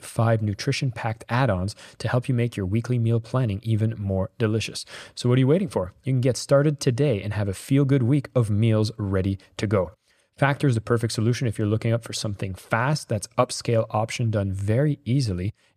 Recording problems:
none

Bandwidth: 14.5 kHz